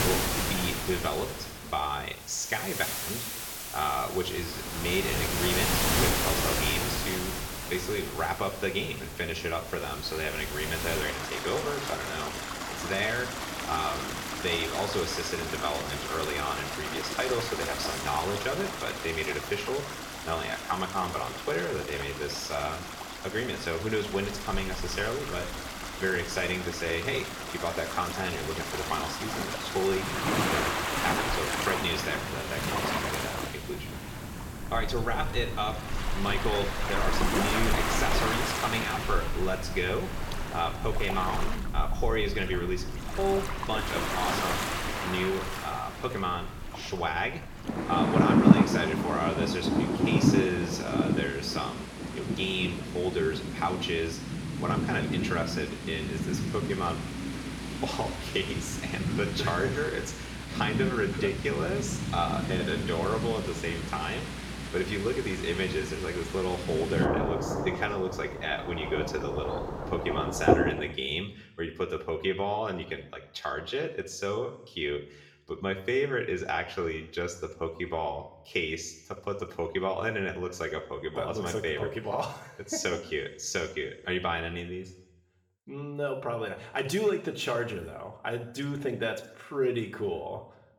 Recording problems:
room echo; slight; dies away in 0.7 s
off-mic speech; somewhat distant
rain or running water; very loud; until 1:11; as loud as the speech

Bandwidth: 17 kHz